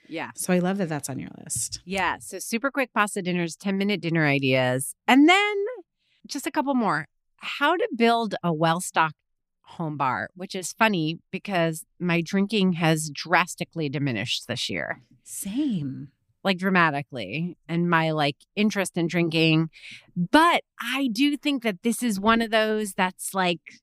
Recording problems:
none

